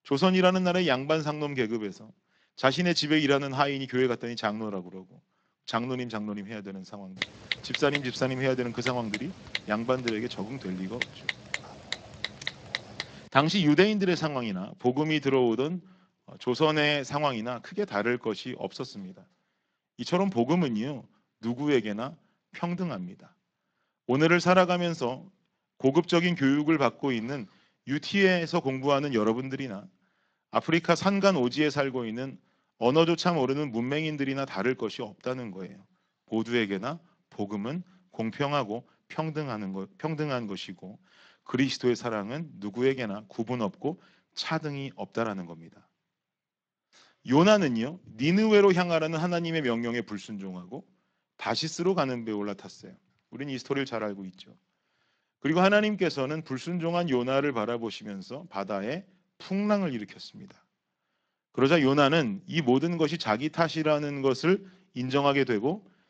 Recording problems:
garbled, watery; slightly
keyboard typing; noticeable; from 7 to 13 s; peak 4 dB below the speech

